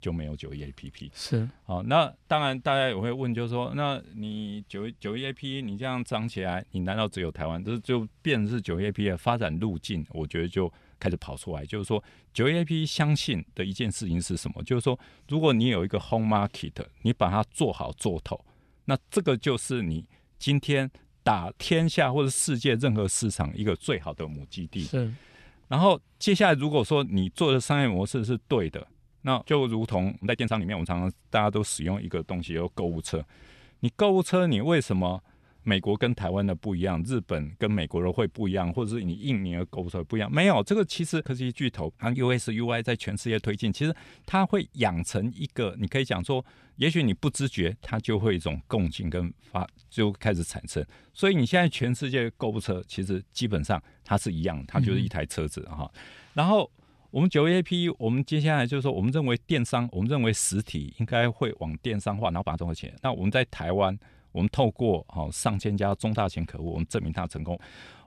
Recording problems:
uneven, jittery; strongly; from 6 s to 1:05

